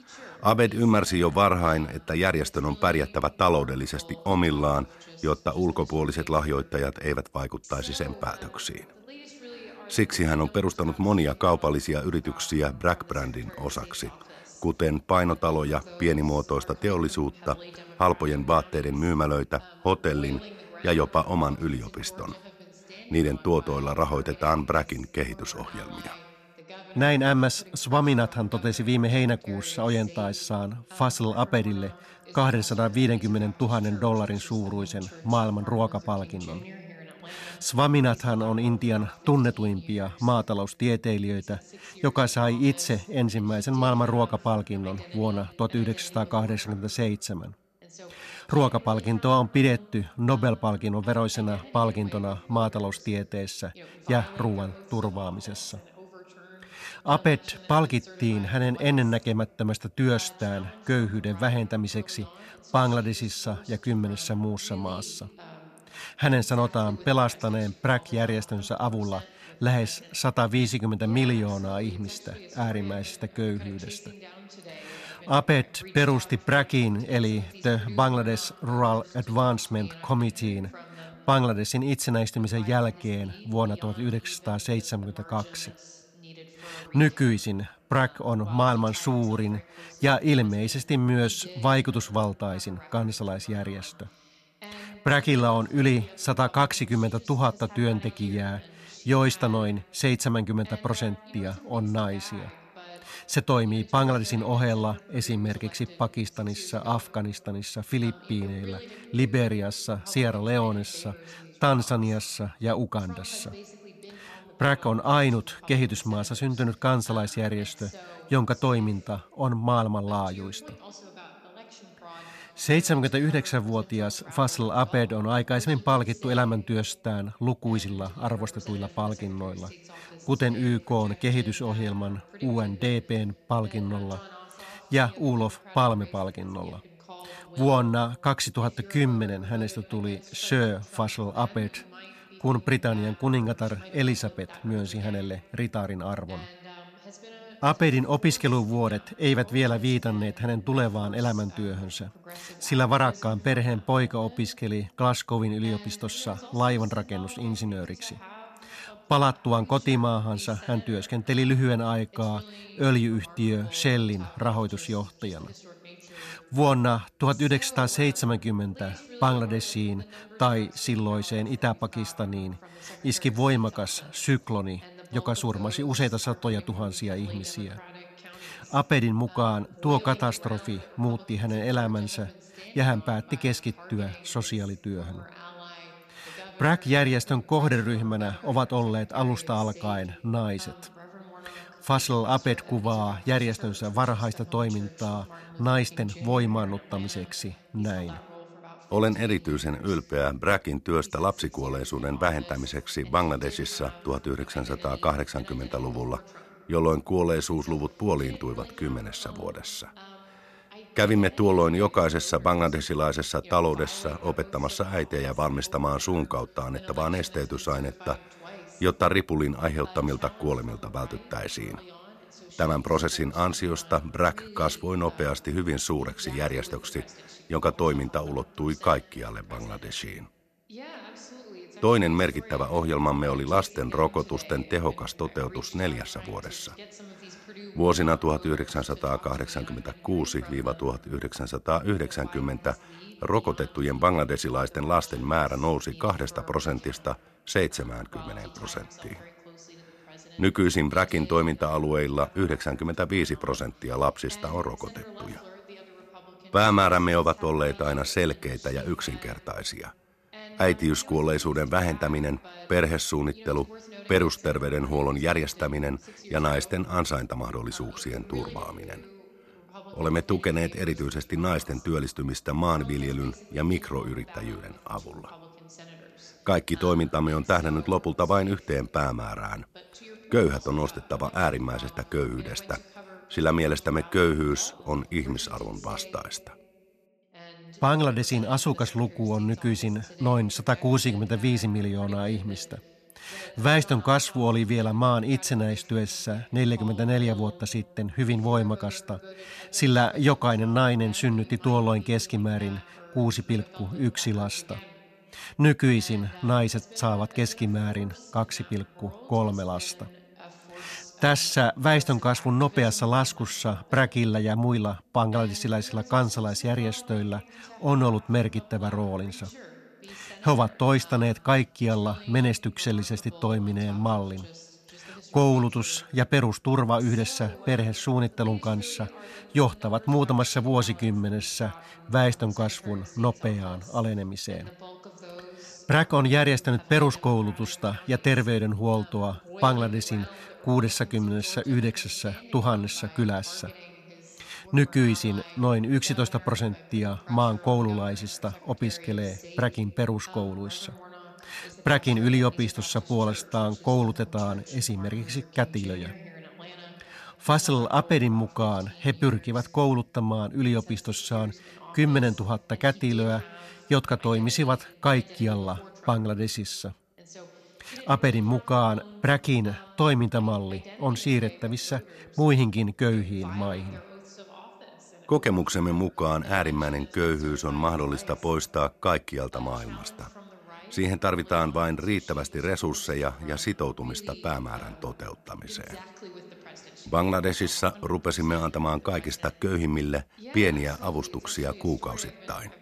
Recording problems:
voice in the background; faint; throughout; 20 dB below the speech

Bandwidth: 13.5 kHz